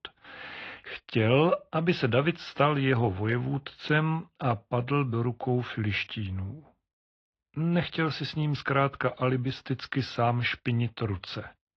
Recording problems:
muffled; very; fading above 3.5 kHz
garbled, watery; slightly

